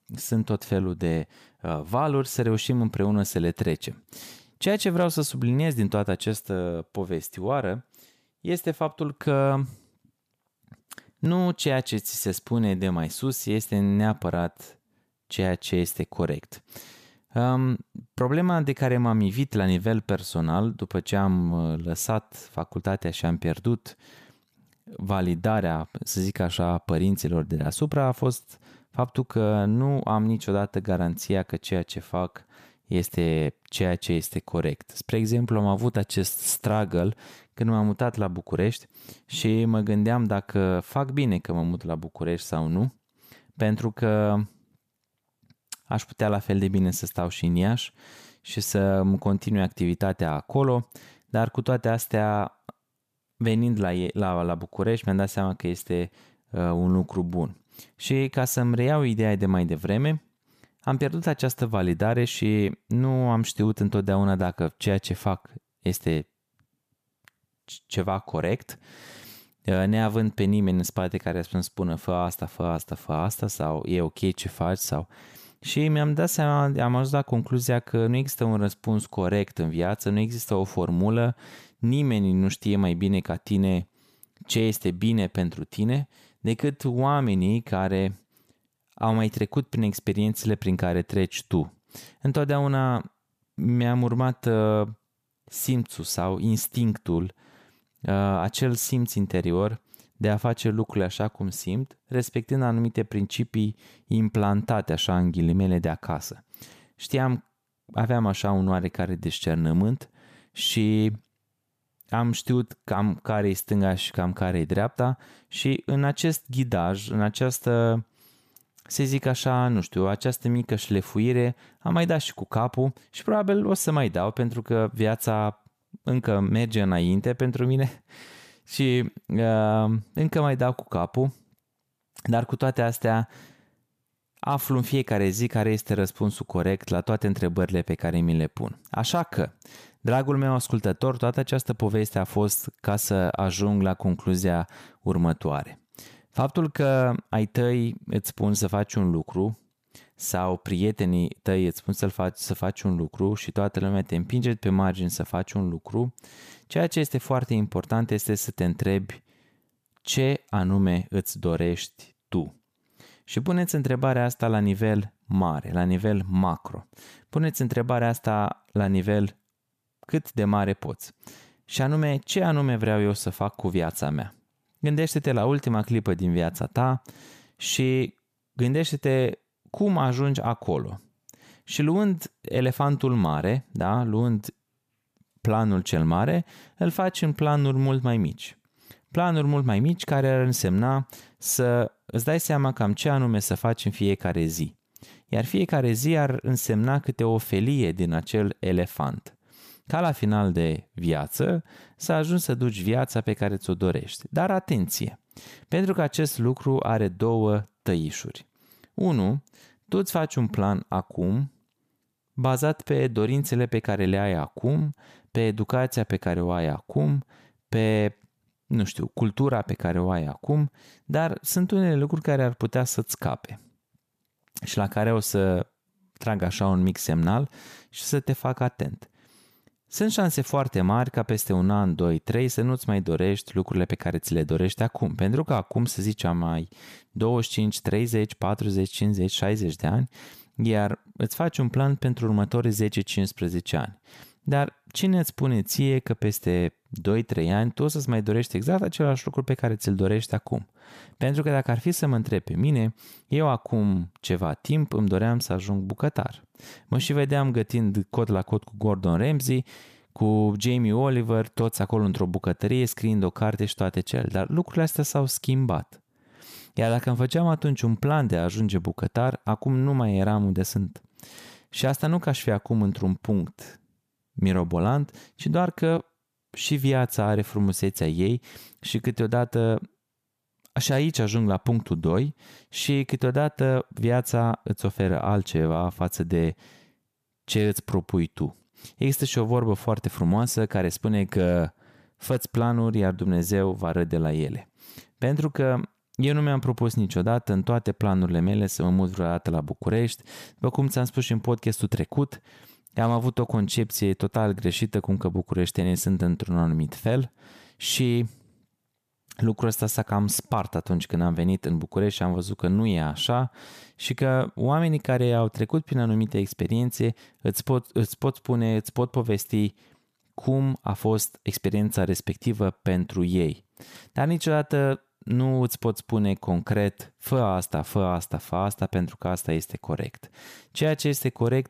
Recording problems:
none

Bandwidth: 14.5 kHz